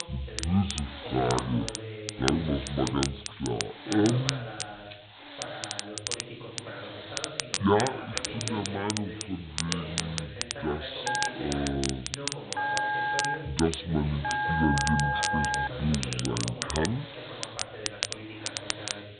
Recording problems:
high frequencies cut off; severe; nothing above 4 kHz
wrong speed and pitch; too slow and too low; 0.6 times normal speed
crackle, like an old record; loud; 5 dB below the speech
voice in the background; noticeable; throughout; 10 dB below the speech
hiss; noticeable; throughout; 15 dB below the speech
phone ringing; loud; from 11 to 16 s; peak 3 dB above the speech

